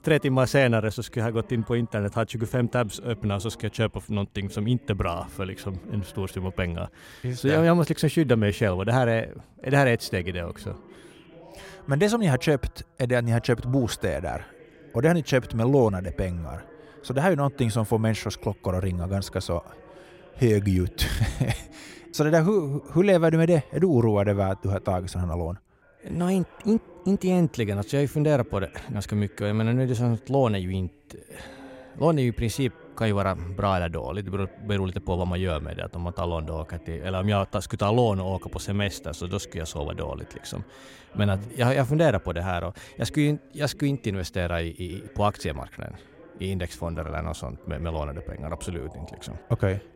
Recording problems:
voice in the background; faint; throughout; 25 dB below the speech

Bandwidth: 16 kHz